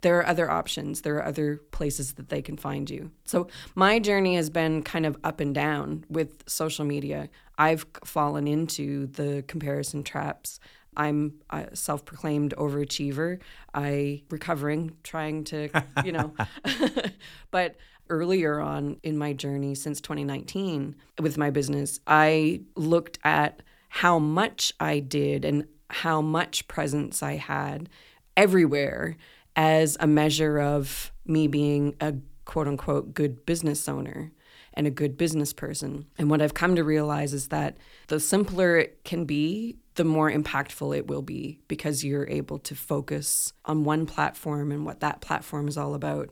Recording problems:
none

